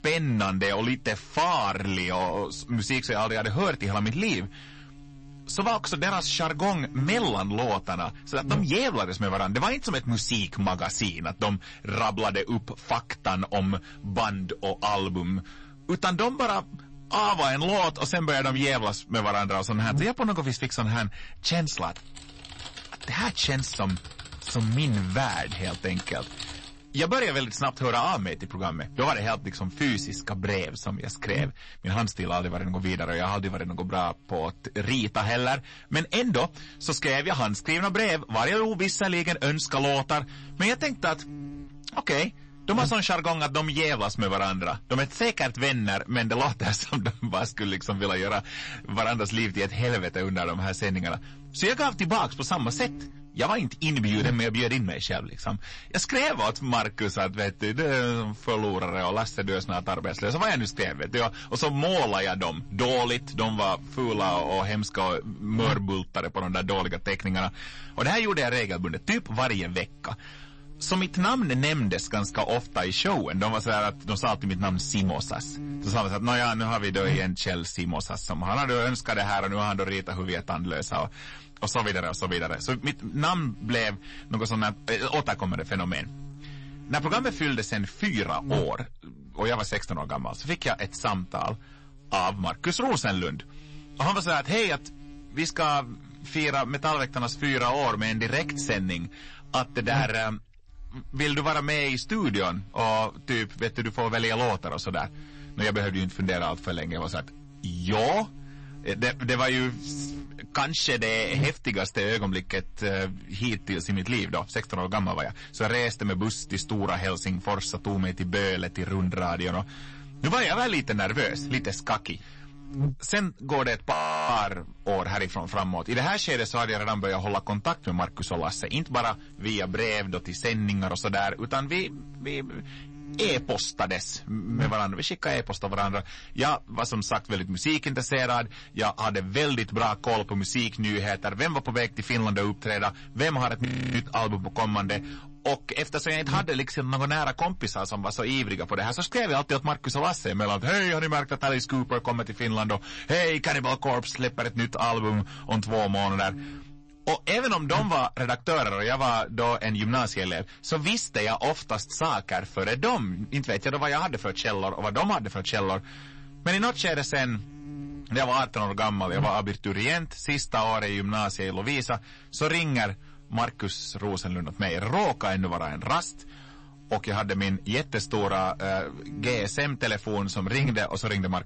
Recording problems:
distortion; heavy; 7% of the sound clipped
garbled, watery; slightly; nothing above 8 kHz
electrical hum; faint; throughout; 50 Hz, 20 dB below the speech
keyboard typing; noticeable; from 22 to 27 s; peak 9 dB below the speech
audio freezing; at 2:04 and at 2:24

